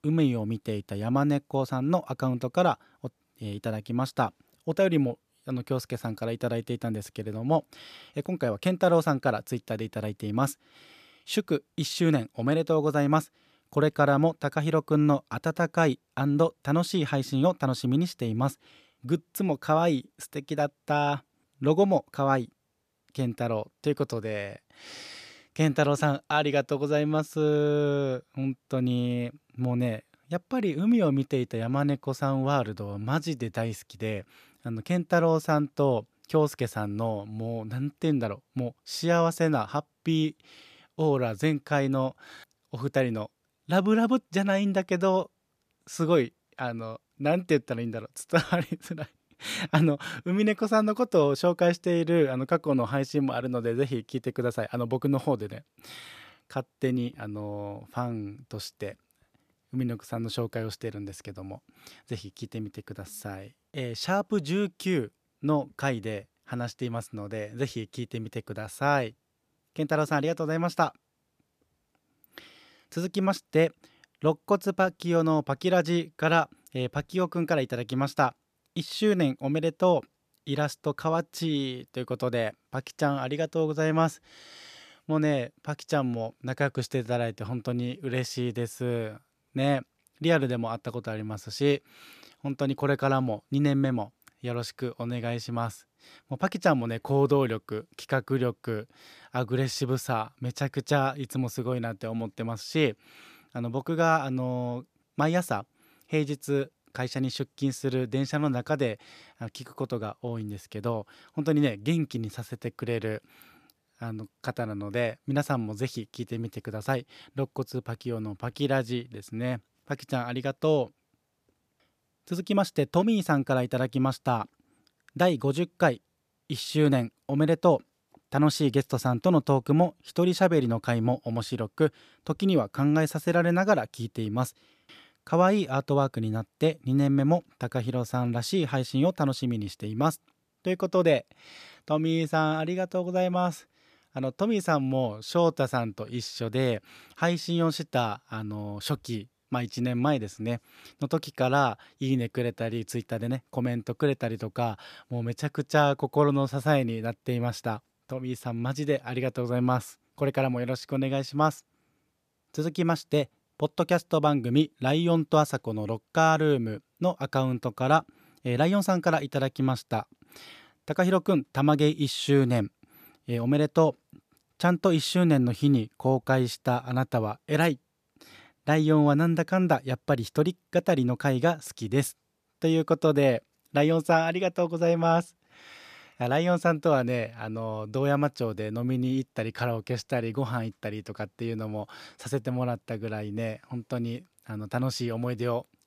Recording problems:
none

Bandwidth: 14.5 kHz